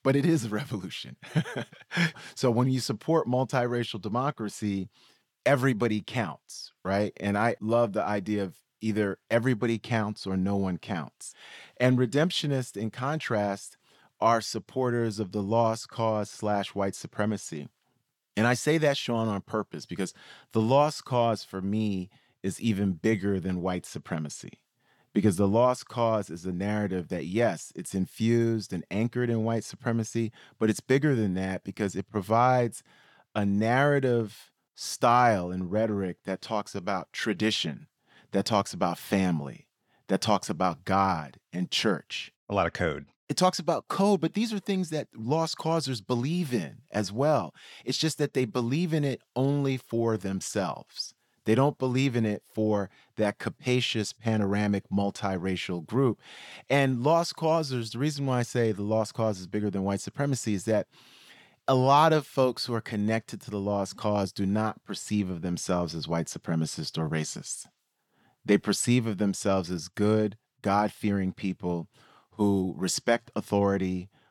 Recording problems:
none

